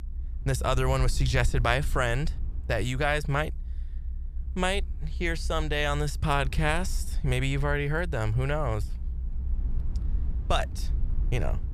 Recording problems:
low rumble; faint; throughout; 25 dB below the speech

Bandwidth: 14.5 kHz